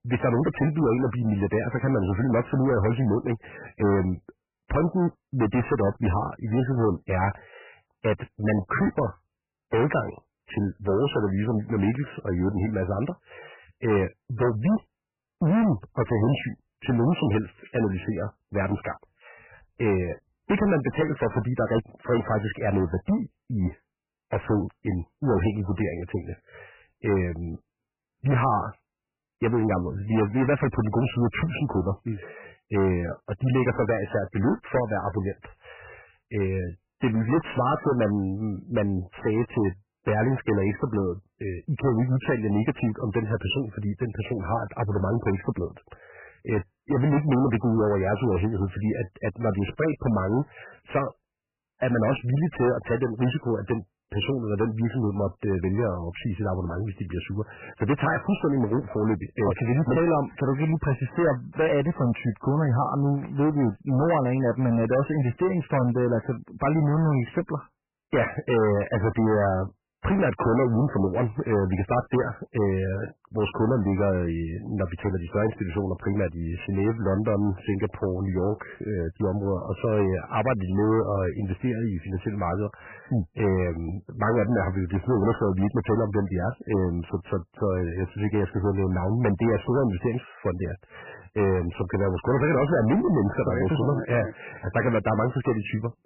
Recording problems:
distortion; heavy; 12% of the sound clipped
garbled, watery; badly; nothing above 3 kHz

